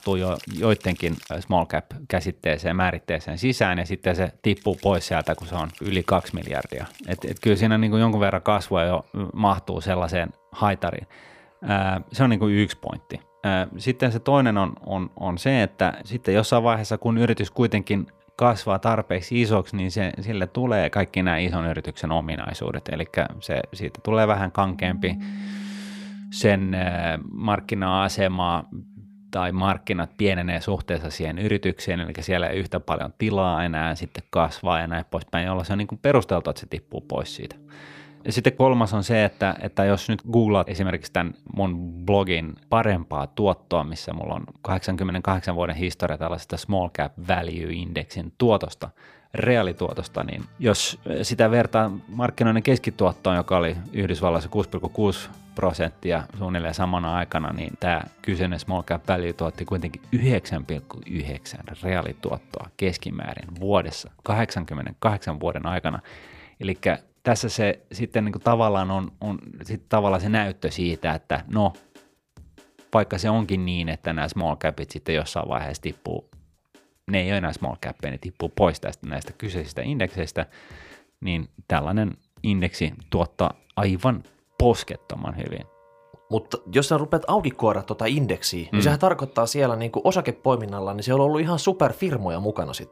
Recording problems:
background music; faint; throughout; 25 dB below the speech

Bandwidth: 15 kHz